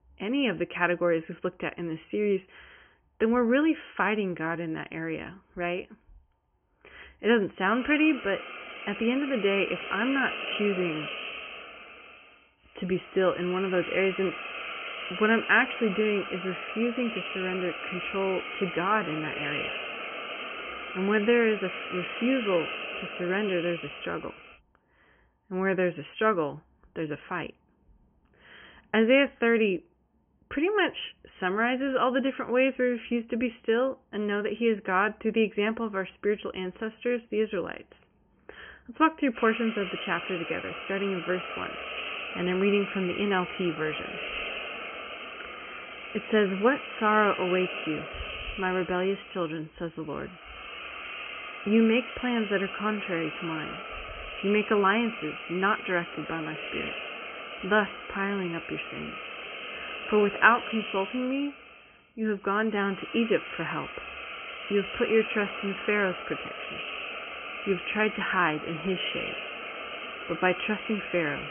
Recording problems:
high frequencies cut off; severe; nothing above 3 kHz
hiss; loud; from 8 to 25 s and from 39 s on; 8 dB below the speech

